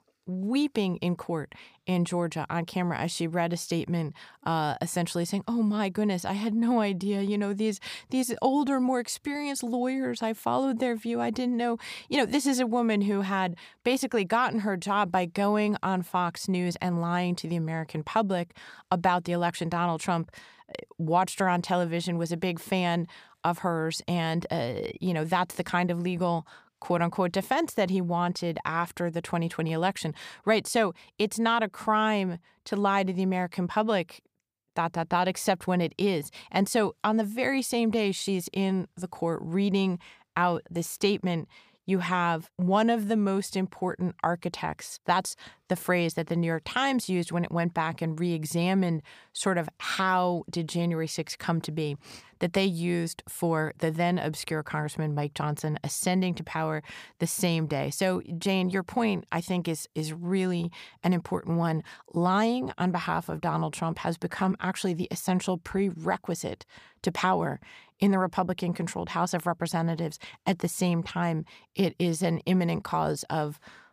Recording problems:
none

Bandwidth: 15 kHz